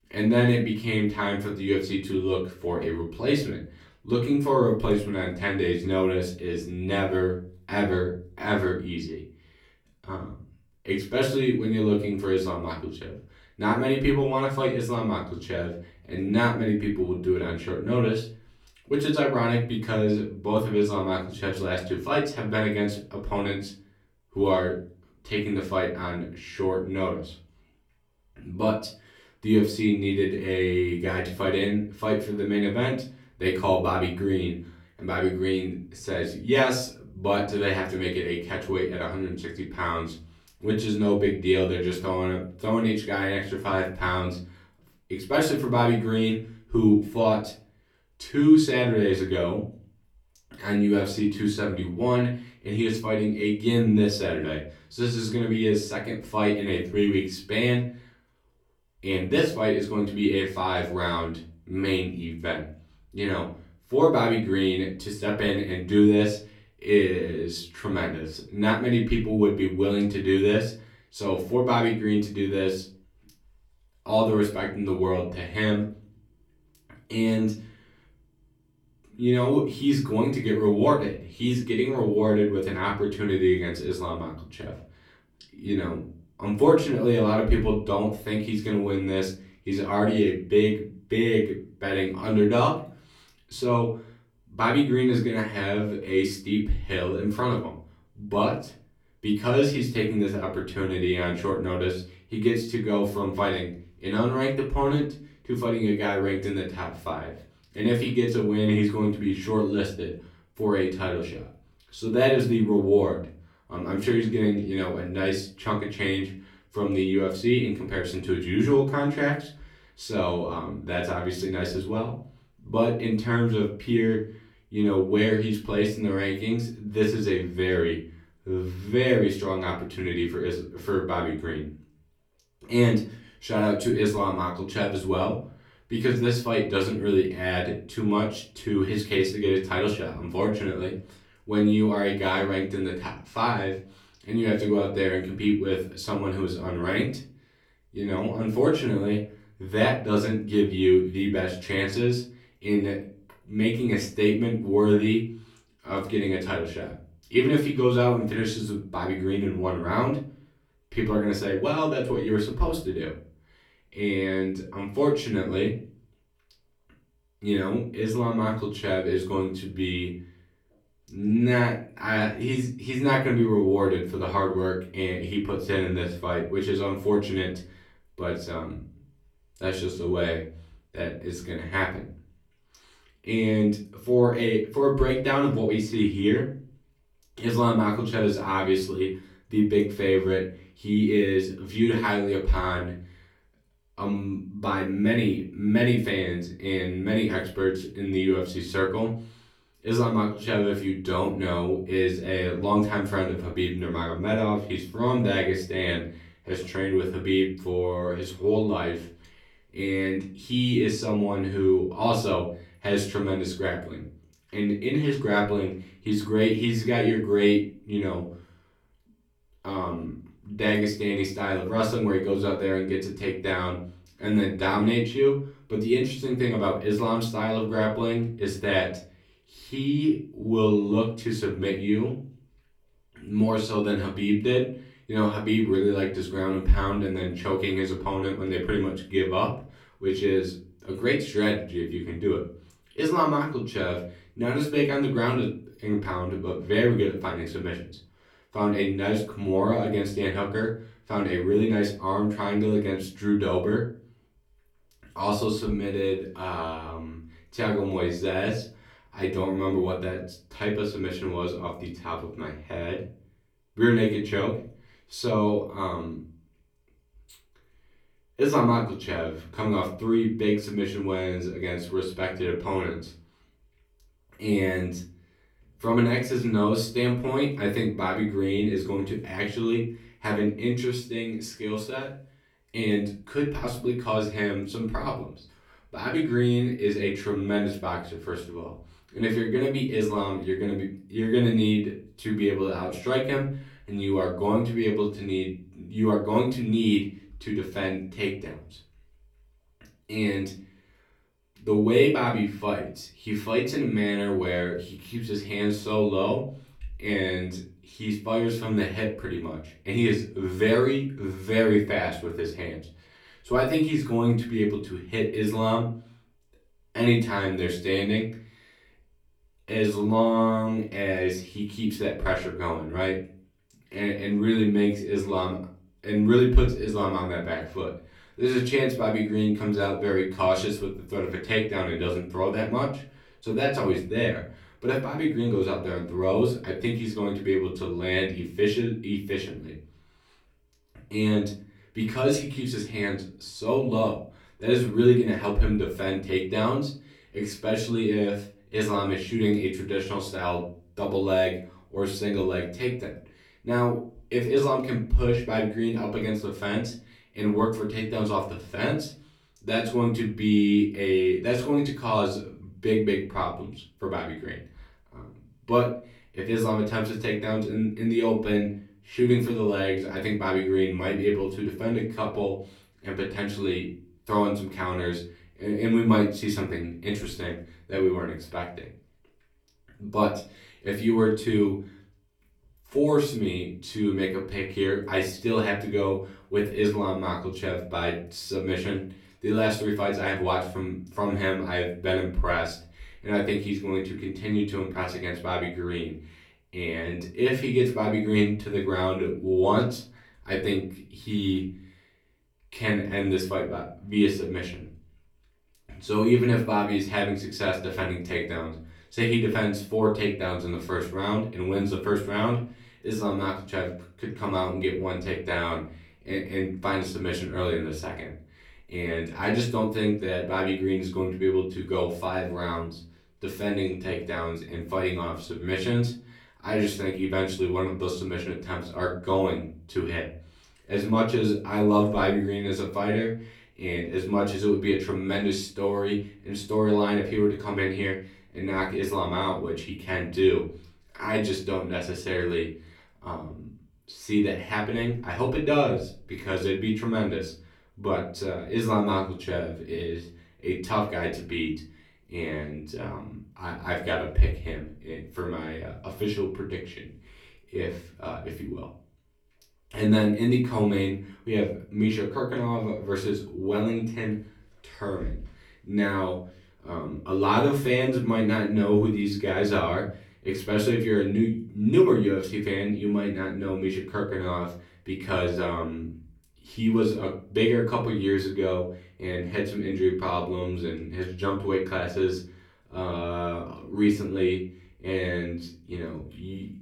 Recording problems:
off-mic speech; far
room echo; slight; dies away in 0.4 s

